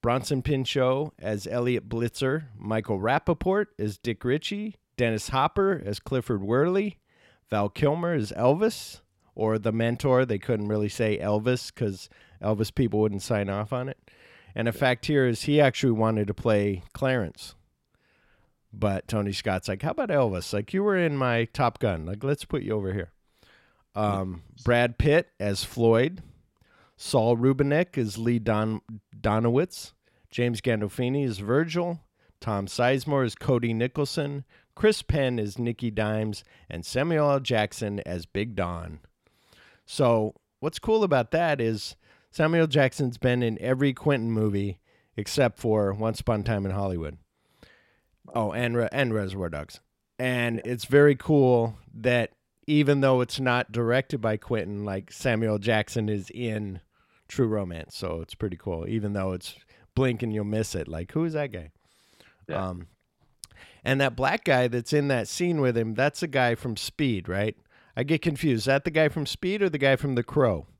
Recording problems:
none

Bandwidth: 16 kHz